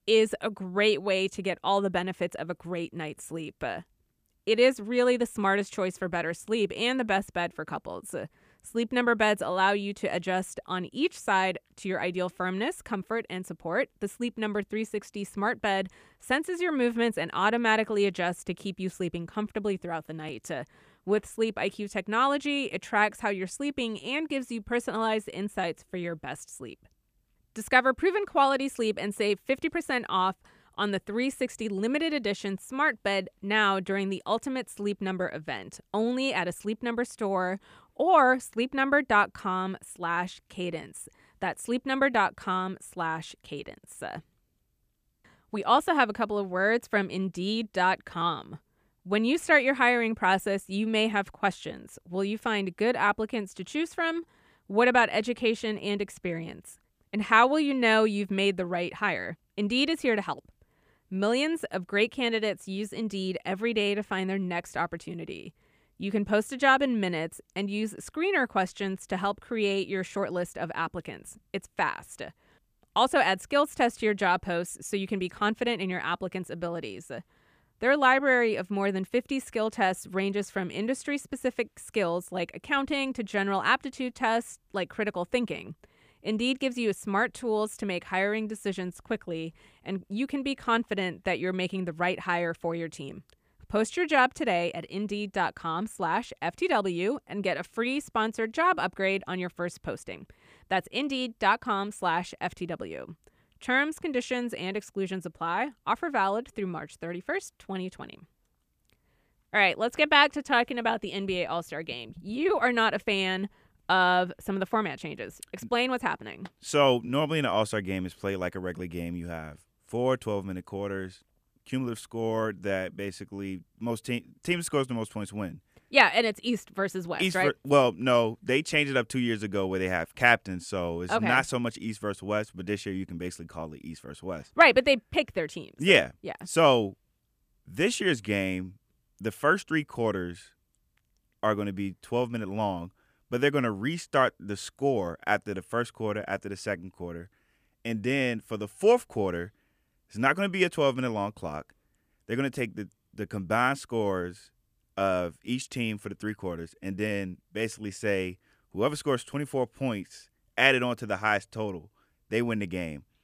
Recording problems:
none

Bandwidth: 15 kHz